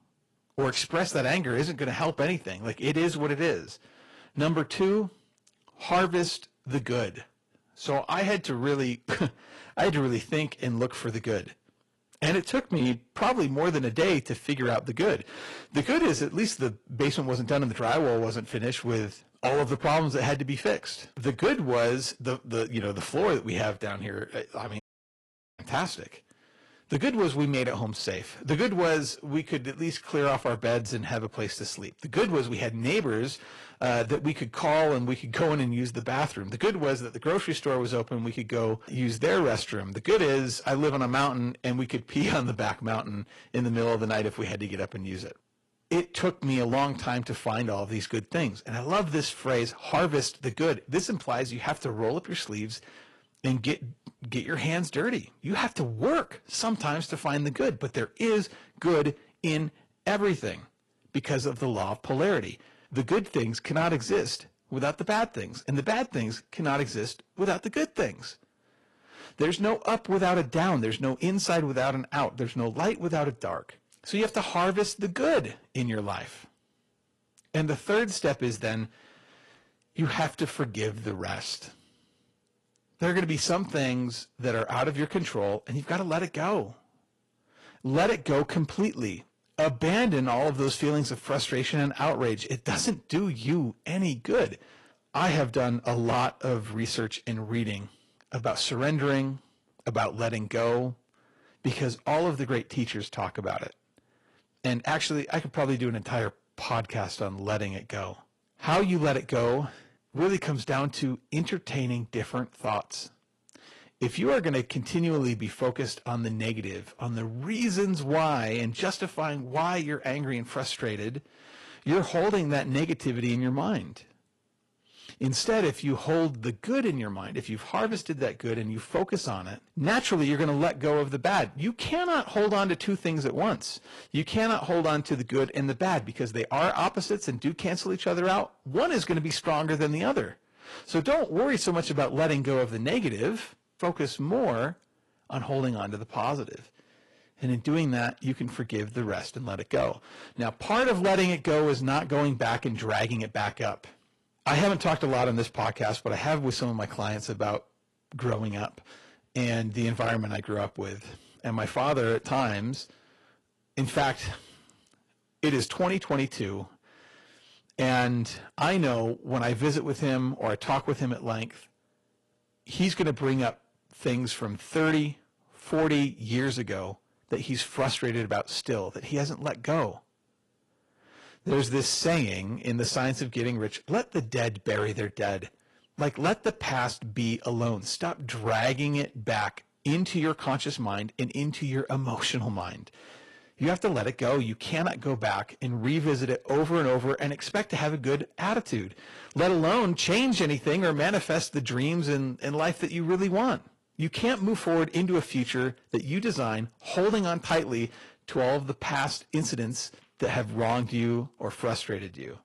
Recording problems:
distortion; slight; 5% of the sound clipped
garbled, watery; slightly; nothing above 11 kHz
audio cutting out; at 25 s for 1 s

